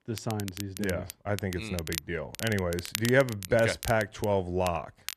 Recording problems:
crackle, like an old record; noticeable; 10 dB below the speech

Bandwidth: 14 kHz